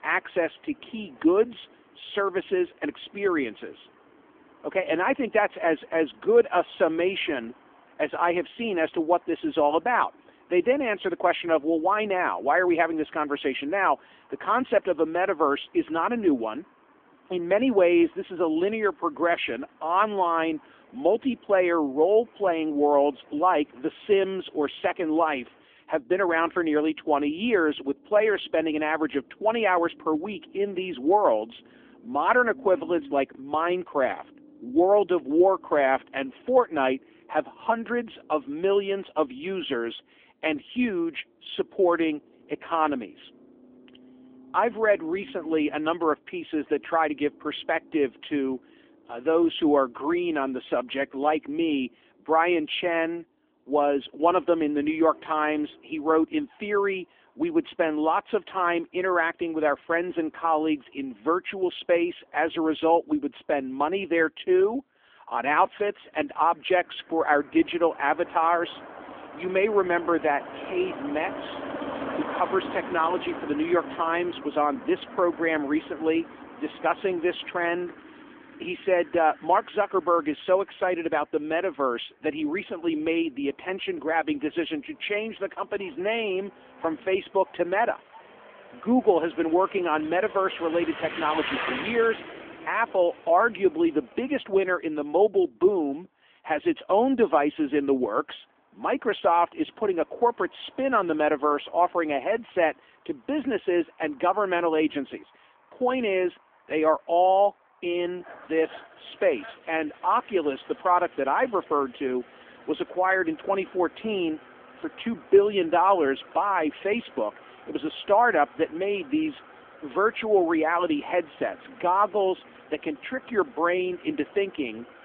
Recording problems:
phone-call audio; nothing above 3.5 kHz
traffic noise; noticeable; throughout; 15 dB below the speech

